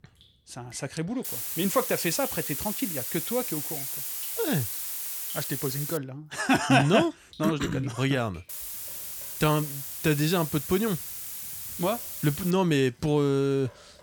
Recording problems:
hiss; loud; from 1.5 to 6 s and from 8.5 to 13 s; 4 dB below the speech
rain or running water; faint; throughout; 30 dB below the speech

